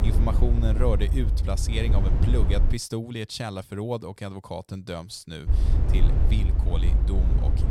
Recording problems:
low rumble; loud; until 2.5 s and from 5.5 s on; 5 dB below the speech

